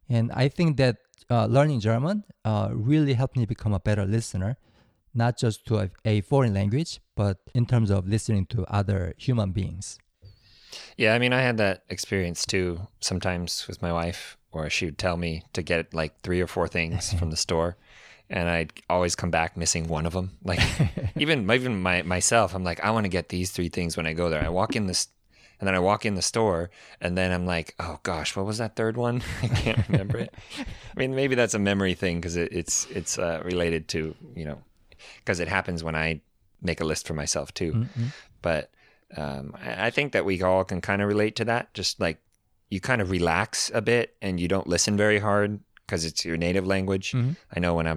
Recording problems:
abrupt cut into speech; at the end

